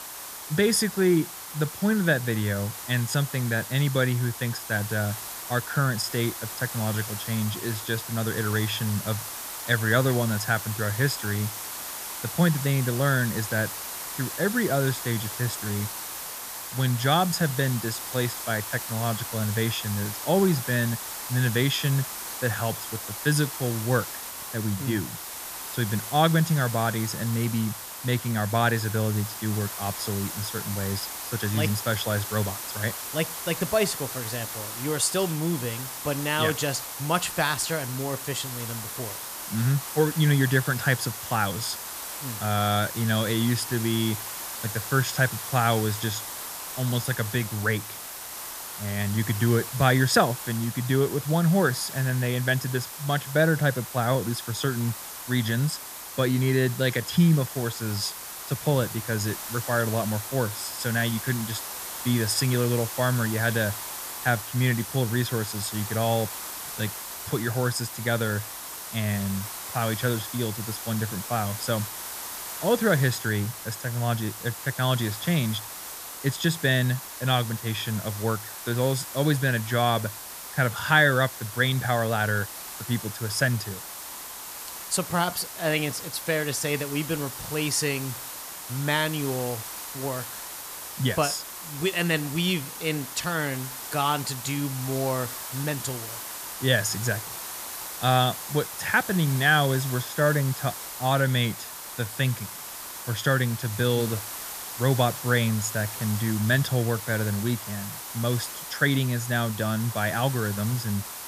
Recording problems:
hiss; loud; throughout; 8 dB below the speech

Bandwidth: 14.5 kHz